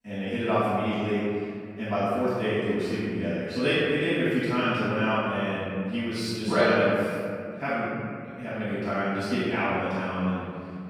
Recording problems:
room echo; strong; dies away in 2.2 s
off-mic speech; far

